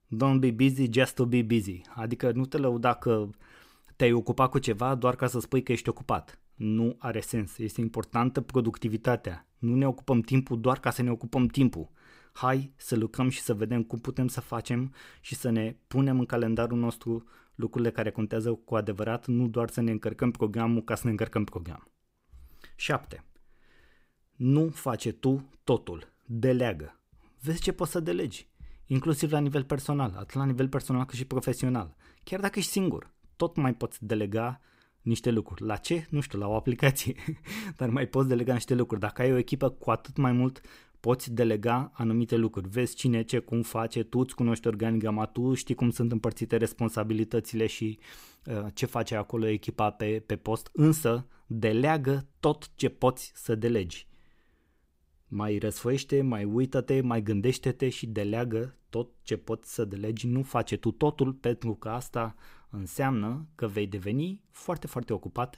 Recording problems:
none

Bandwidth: 15.5 kHz